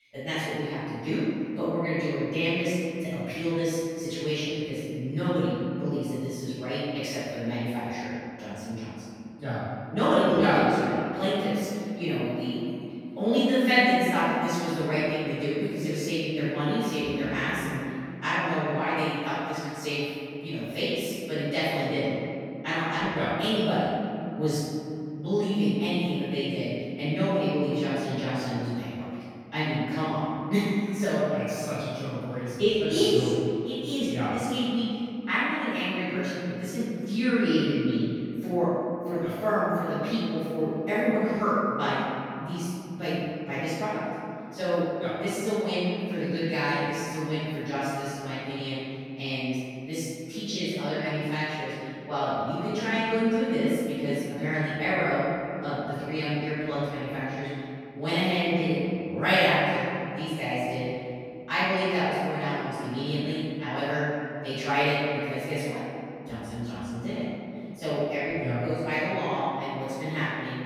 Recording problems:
room echo; strong; dies away in 2.6 s
off-mic speech; far

